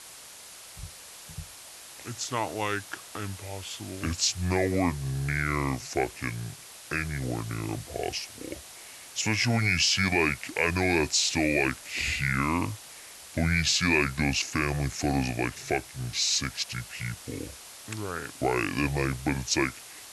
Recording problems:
wrong speed and pitch; too slow and too low; 0.7 times normal speed
hiss; noticeable; throughout; 15 dB below the speech

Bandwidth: 12 kHz